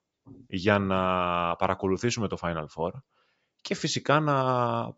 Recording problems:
high frequencies cut off; noticeable; nothing above 8 kHz

